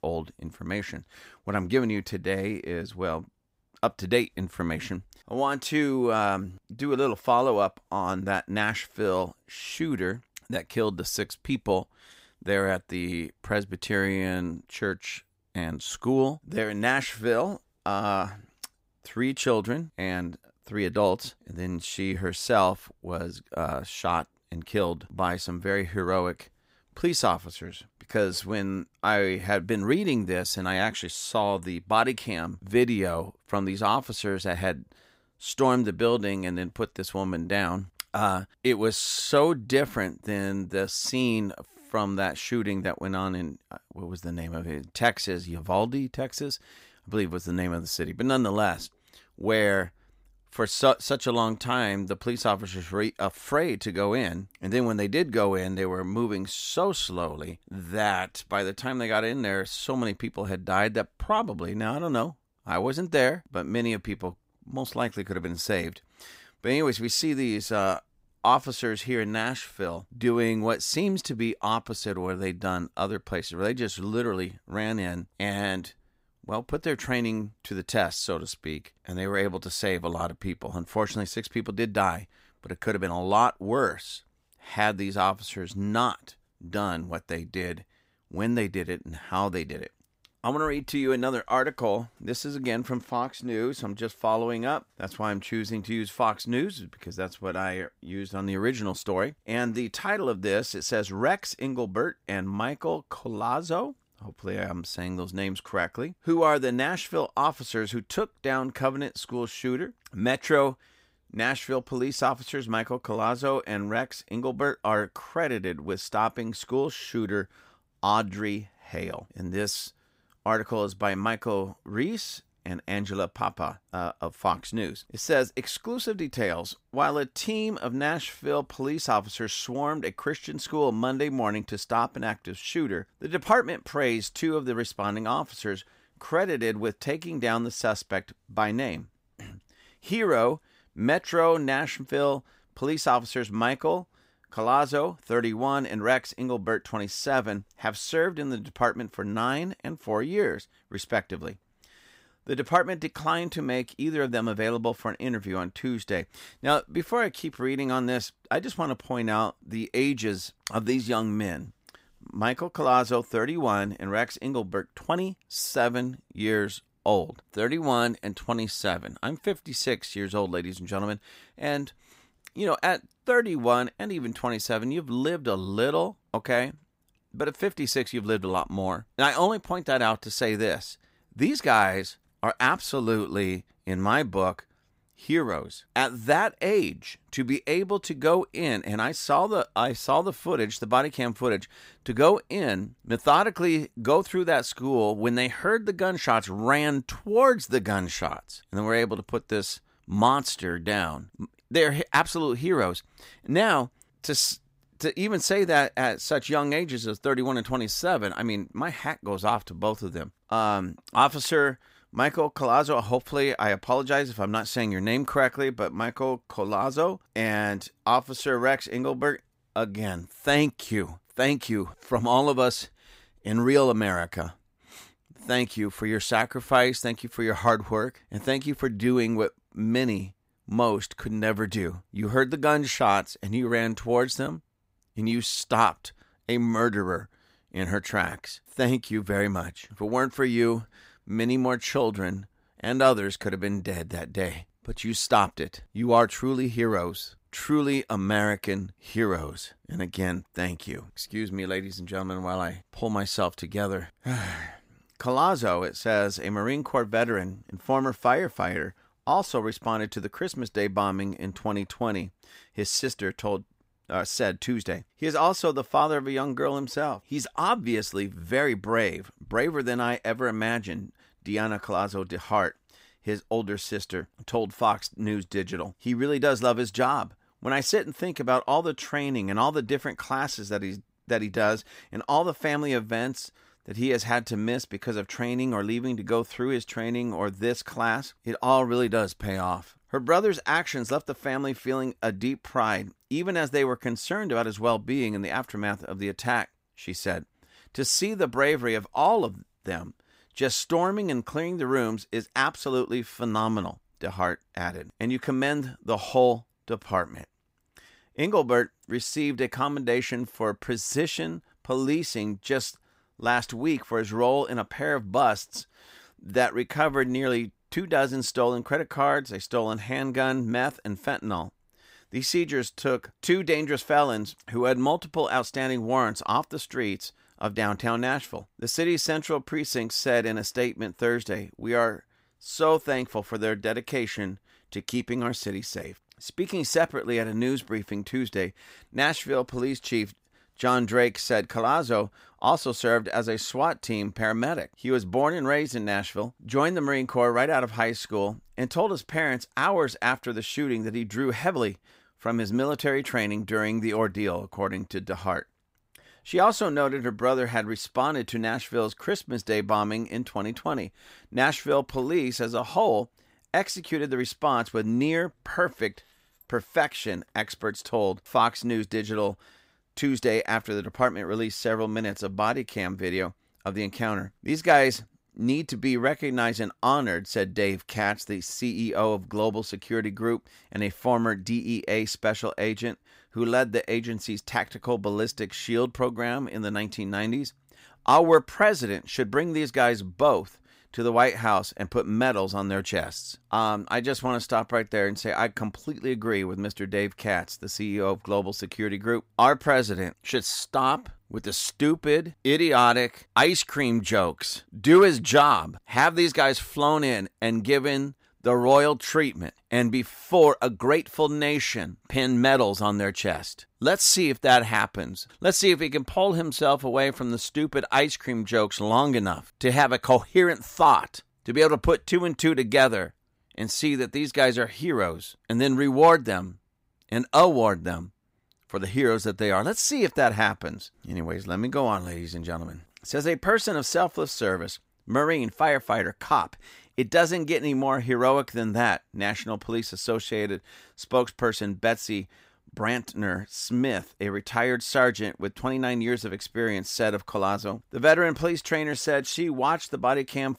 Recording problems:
none

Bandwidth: 15.5 kHz